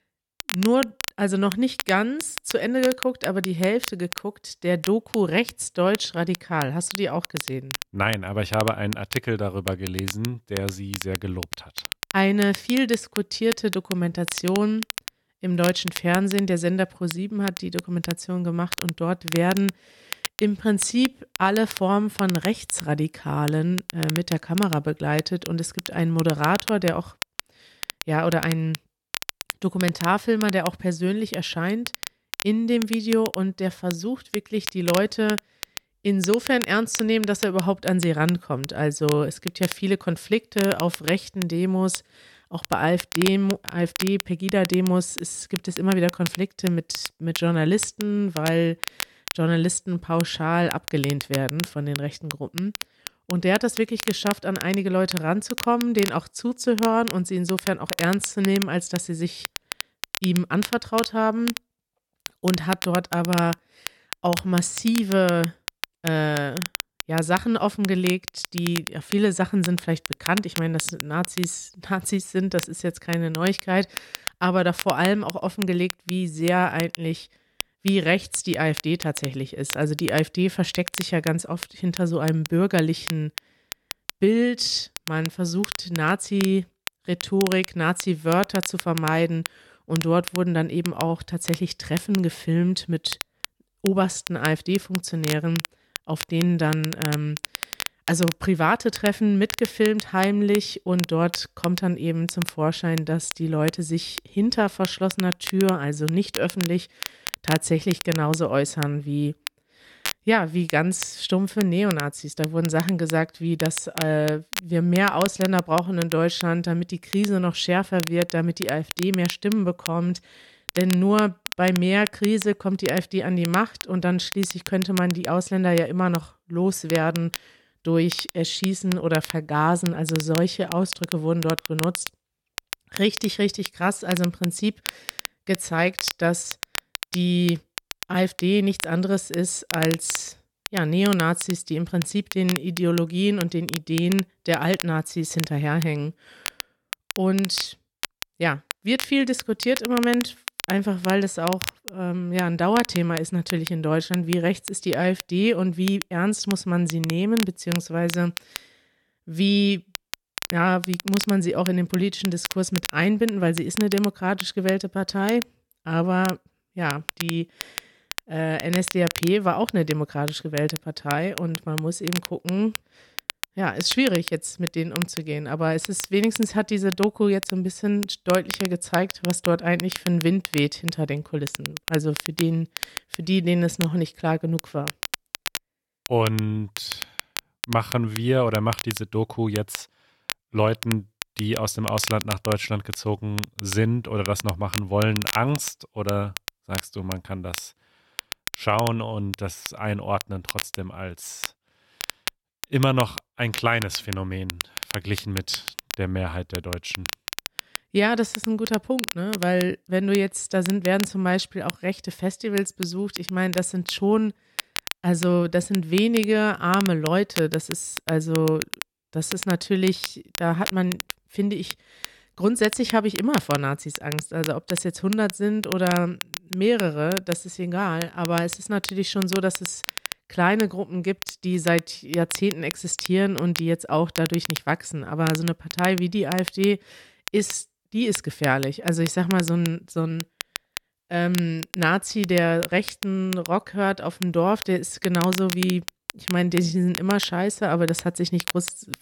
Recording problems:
crackle, like an old record; loud; 10 dB below the speech

